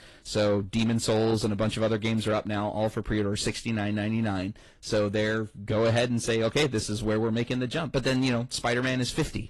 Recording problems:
distortion; slight; 10 dB below the speech
garbled, watery; slightly; nothing above 11 kHz

